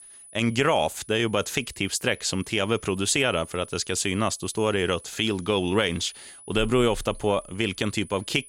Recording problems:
high-pitched whine; noticeable; throughout; 10 kHz, 20 dB below the speech

